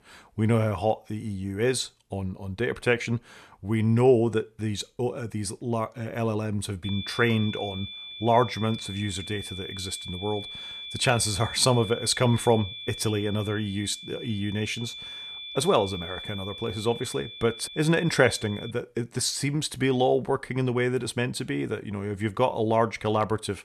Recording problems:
high-pitched whine; noticeable; from 7 to 19 s; 3.5 kHz, 10 dB below the speech

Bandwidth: 13.5 kHz